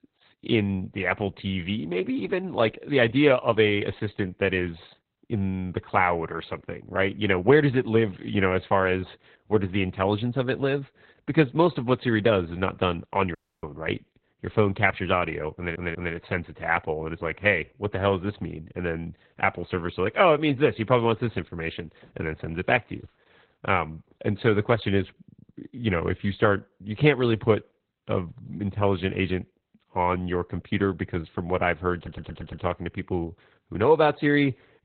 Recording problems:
garbled, watery; badly; nothing above 4 kHz
audio cutting out; at 13 s
audio stuttering; at 16 s and at 32 s

